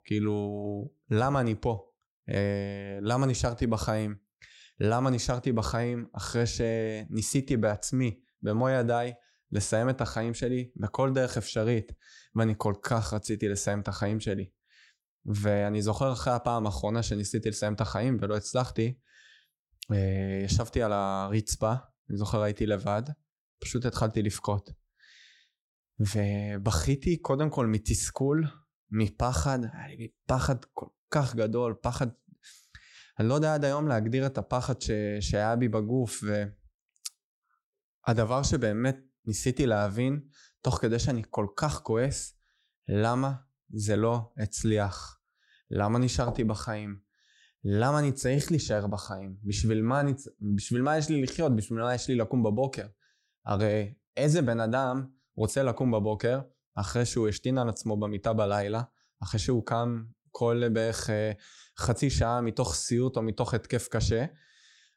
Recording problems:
none

